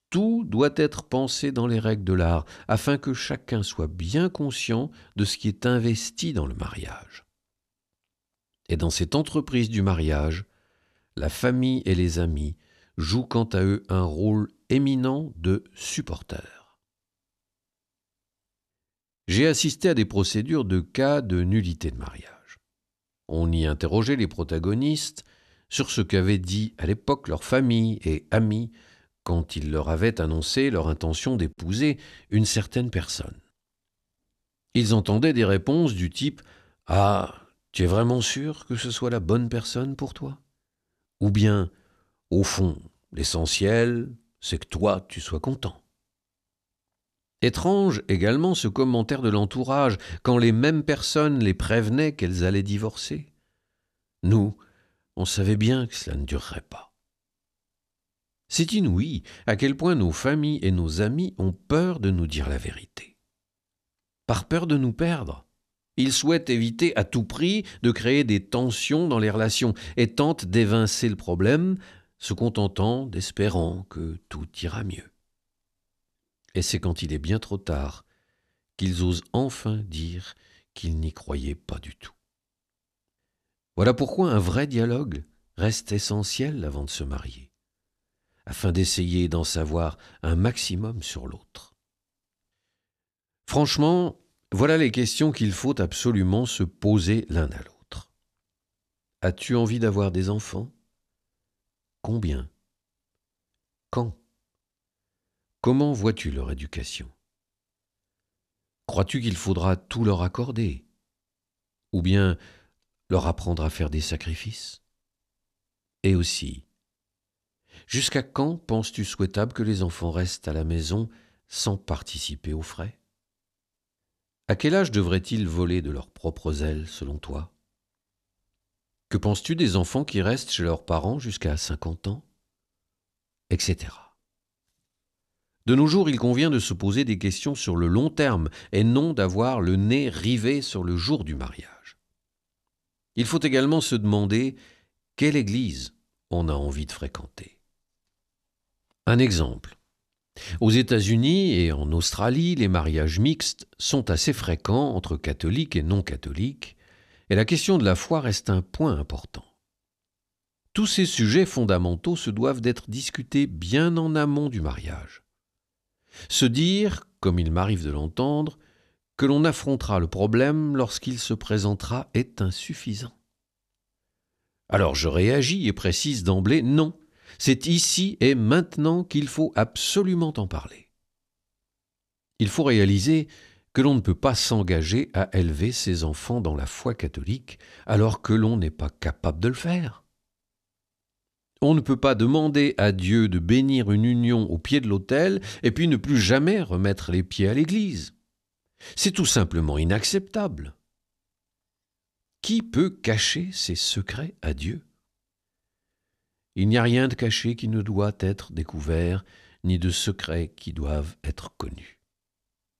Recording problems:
none

